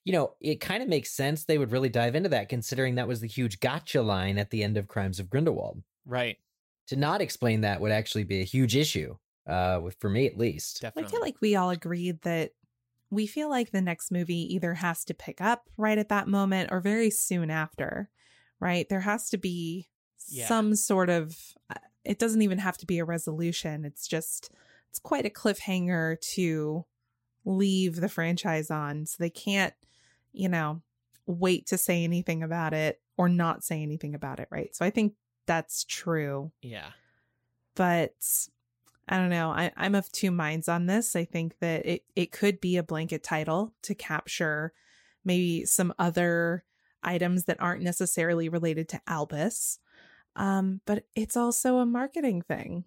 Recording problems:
none

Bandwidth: 16 kHz